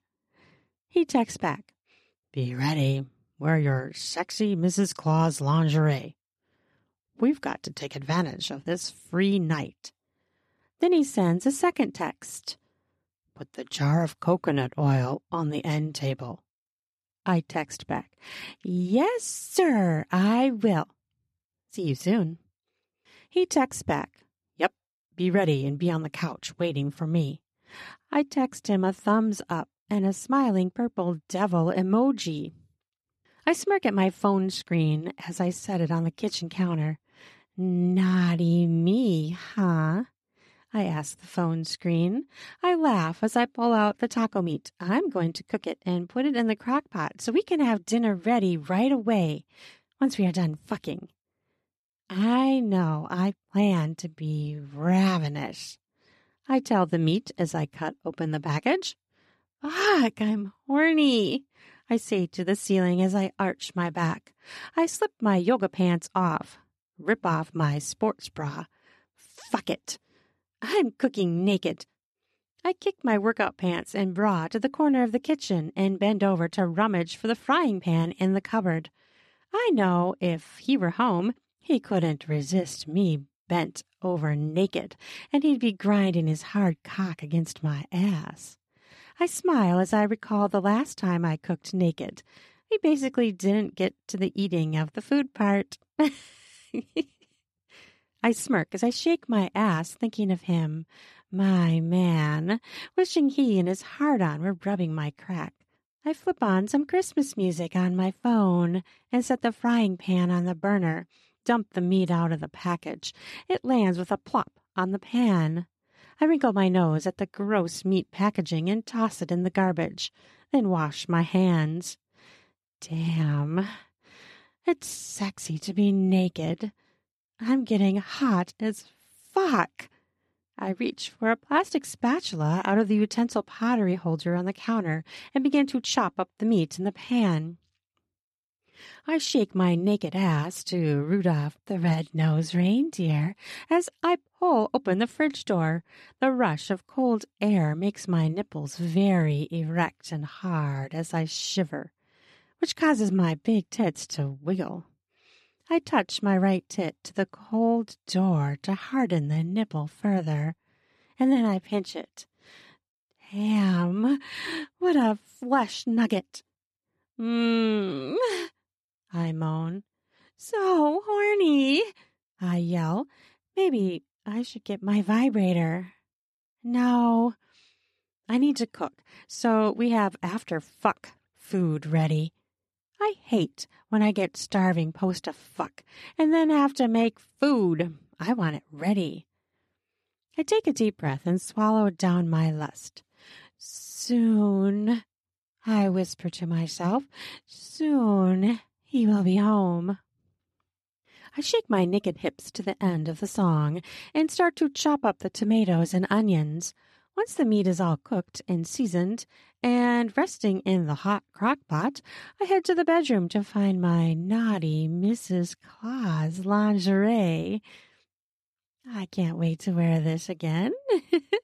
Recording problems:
none

